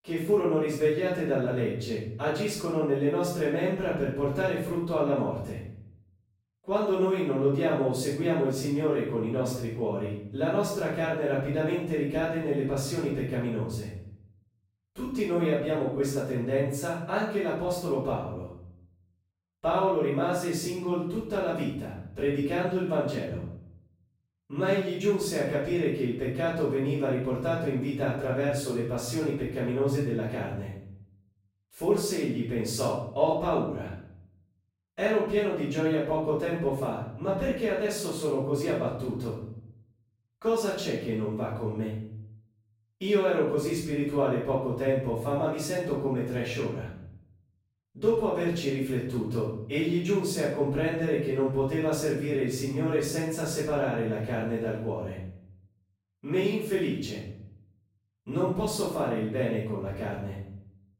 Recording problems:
off-mic speech; far
room echo; noticeable; dies away in 0.6 s

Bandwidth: 16 kHz